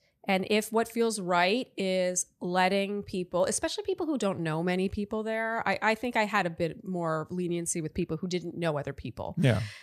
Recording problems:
none

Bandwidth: 14.5 kHz